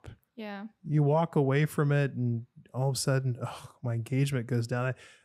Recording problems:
none

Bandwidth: 15.5 kHz